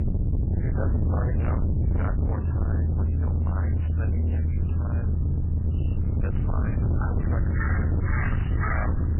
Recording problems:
distortion; heavy; 7 dB below the speech
garbled, watery; badly; nothing above 3 kHz
animal sounds; very loud; throughout; 3 dB above the speech
low rumble; very loud; throughout; as loud as the speech

